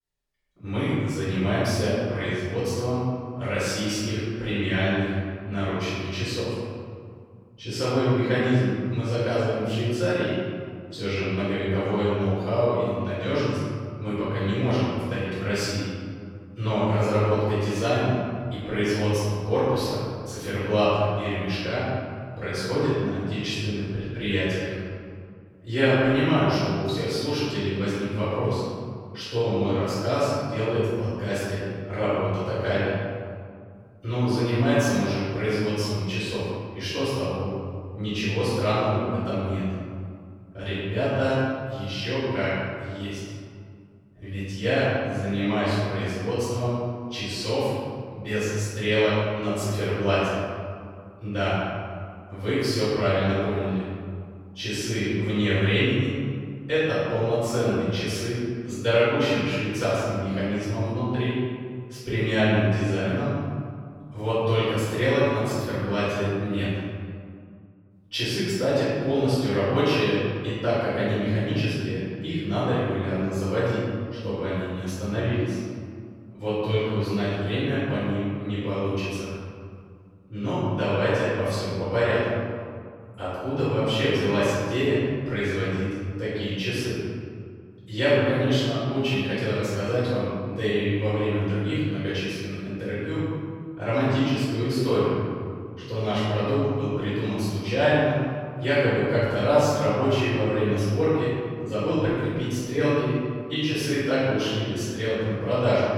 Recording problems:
room echo; strong; dies away in 2 s
off-mic speech; far

